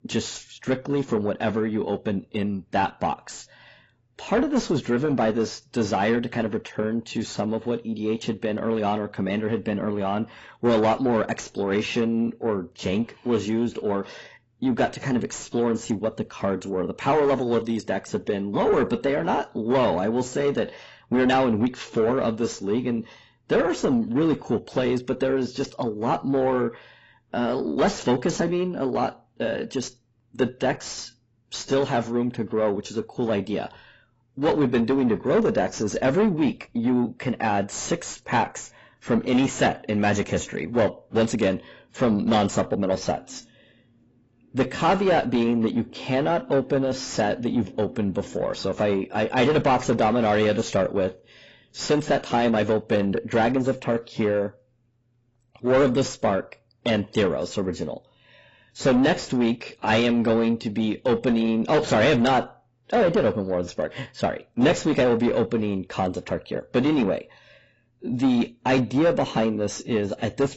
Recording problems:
distortion; heavy; 7 dB below the speech
garbled, watery; badly; nothing above 7.5 kHz

